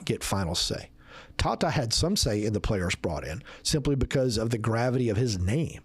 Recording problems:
squashed, flat; heavily

